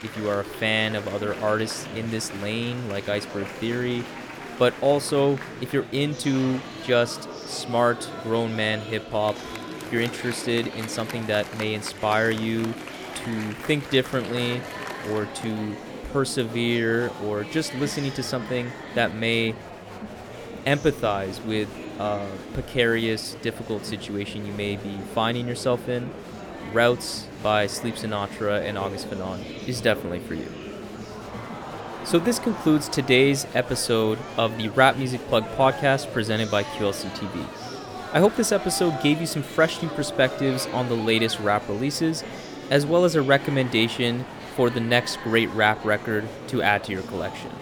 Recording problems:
murmuring crowd; noticeable; throughout; 10 dB below the speech

